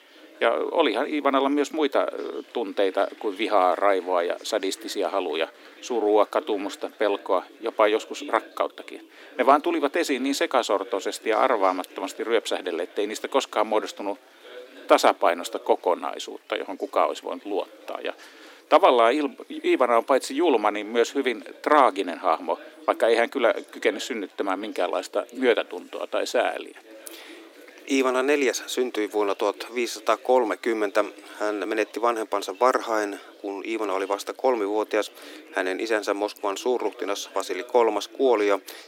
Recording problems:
thin; somewhat; fading below 300 Hz
chatter from many people; faint; throughout; 25 dB below the speech

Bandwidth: 16.5 kHz